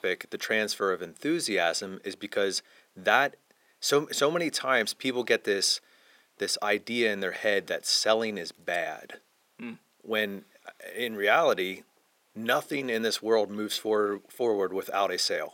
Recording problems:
thin; somewhat; fading below 500 Hz

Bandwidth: 16.5 kHz